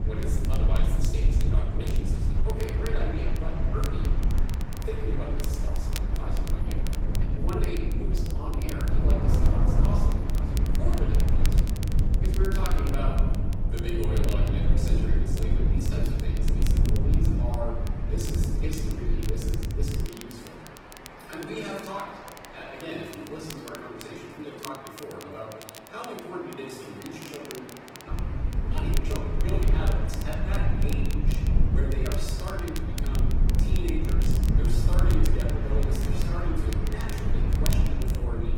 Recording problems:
off-mic speech; far
room echo; noticeable; dies away in 1 s
garbled, watery; slightly; nothing above 16.5 kHz
train or aircraft noise; loud; throughout; 6 dB below the speech
low rumble; loud; until 20 s and from 28 s on; 4 dB below the speech
crackle, like an old record; loud; 8 dB below the speech

